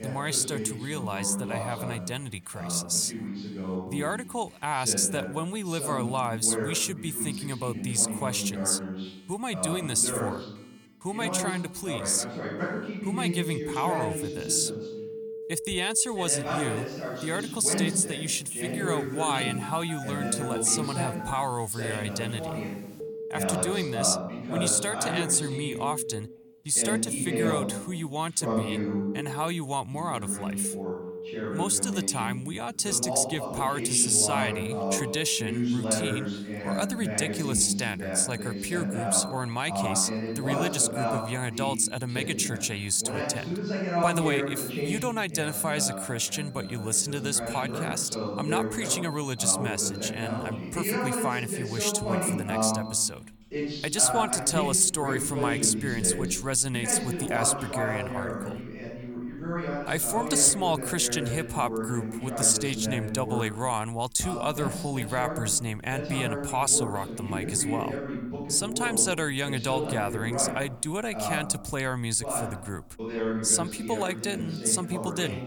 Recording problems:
voice in the background; loud; throughout; 6 dB below the speech
alarms or sirens; noticeable; throughout; 15 dB below the speech

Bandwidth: 18 kHz